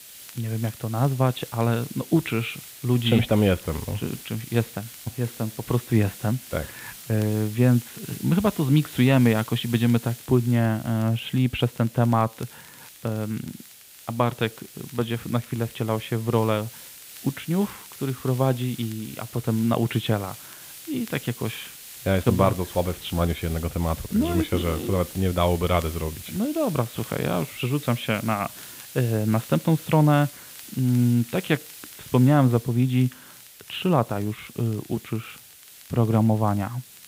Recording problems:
high frequencies cut off; severe; nothing above 4 kHz
hiss; noticeable; throughout; 15 dB below the speech
crackle, like an old record; faint; 30 dB below the speech

